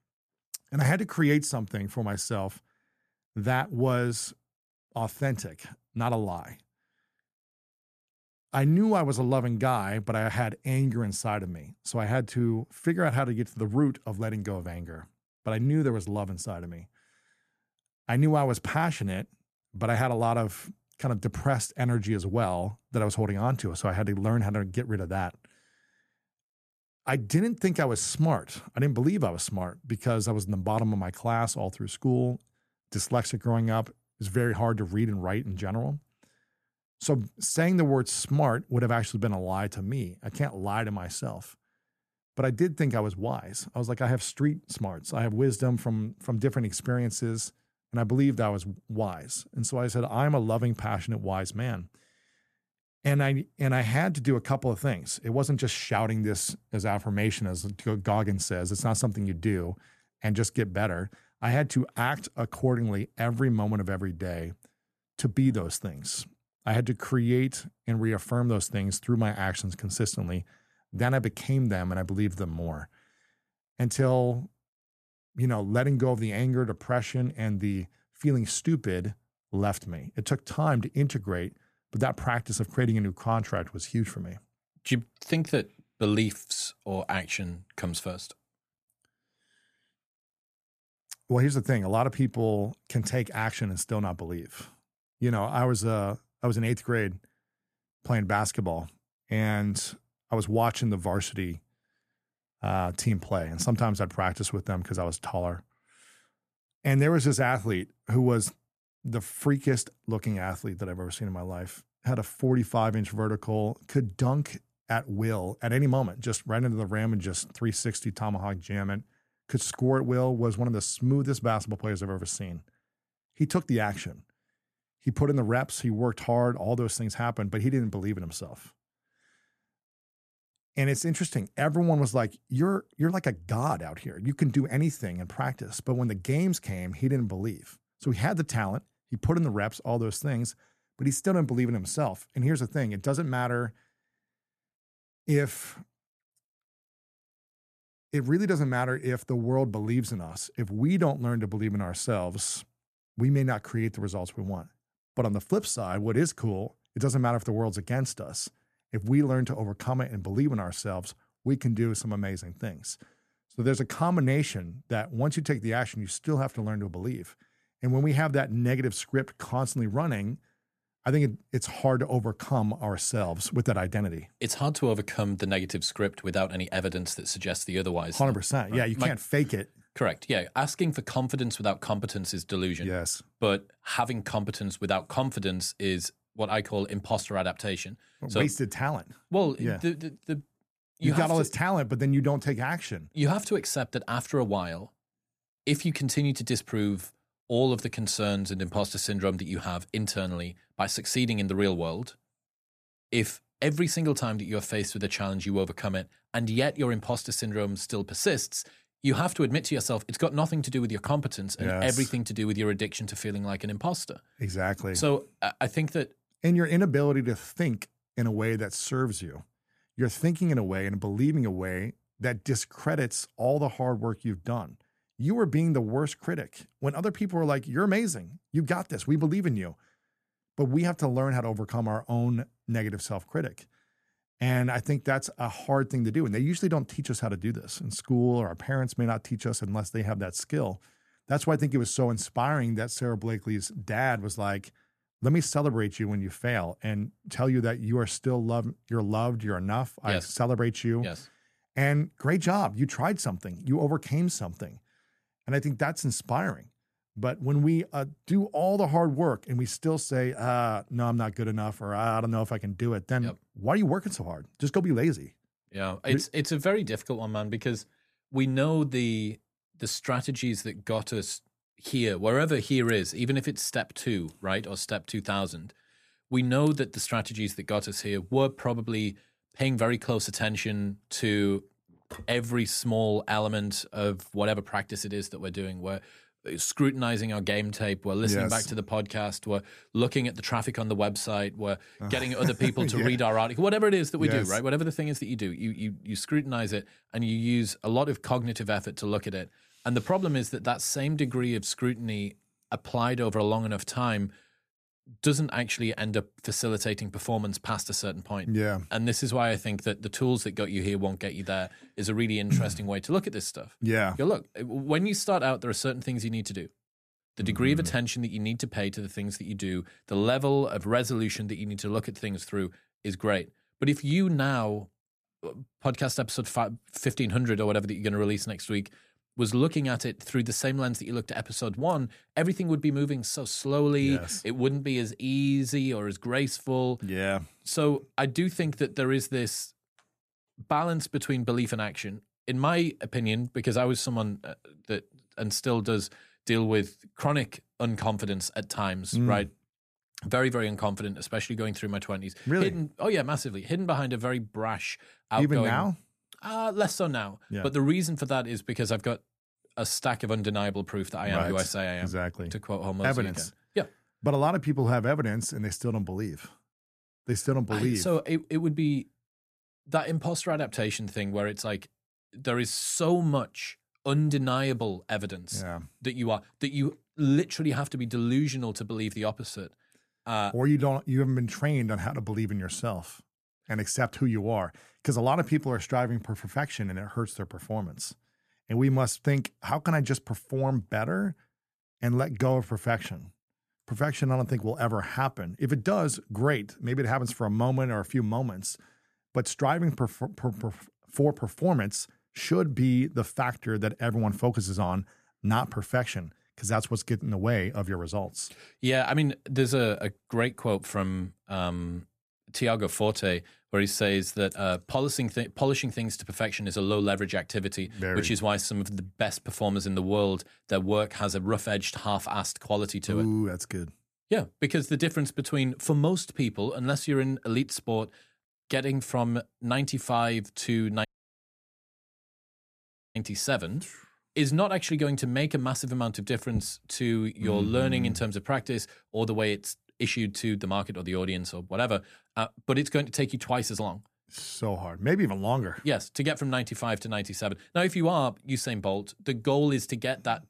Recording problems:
audio cutting out; at 7:11 for 2 s

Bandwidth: 14.5 kHz